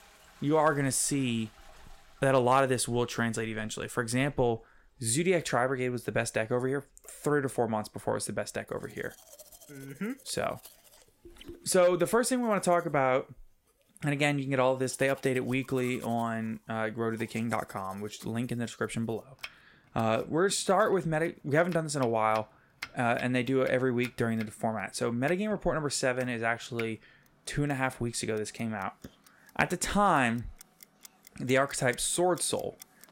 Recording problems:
household noises; faint; throughout; 20 dB below the speech

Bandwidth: 16 kHz